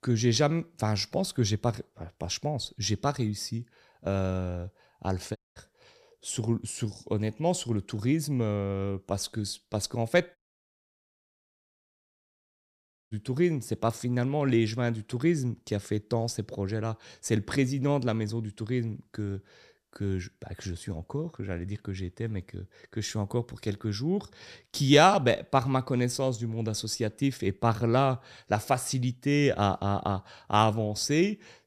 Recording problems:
audio cutting out; at 5.5 s and at 10 s for 3 s

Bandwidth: 14.5 kHz